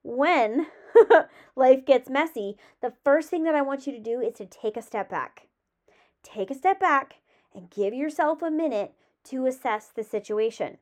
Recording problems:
muffled; slightly; fading above 3 kHz

